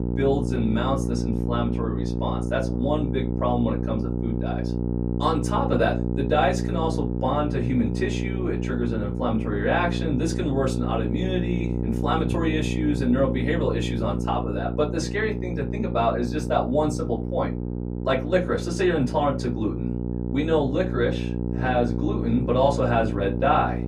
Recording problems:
off-mic speech; far
room echo; very slight; dies away in 0.2 s
electrical hum; loud; throughout; 60 Hz, 8 dB below the speech

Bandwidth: 15.5 kHz